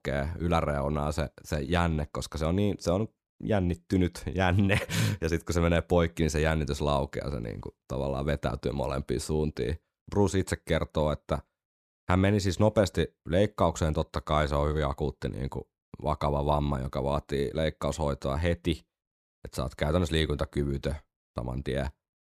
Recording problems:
none

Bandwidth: 14 kHz